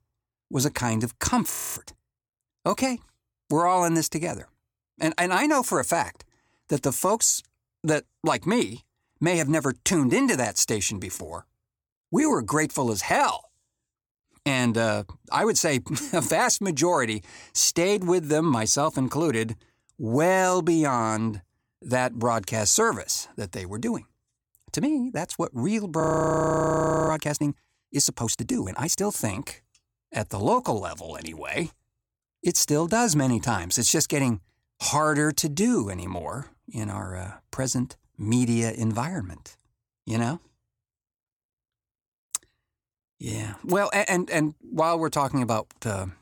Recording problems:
audio freezing; at 1.5 s and at 26 s for 1 s

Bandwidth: 18 kHz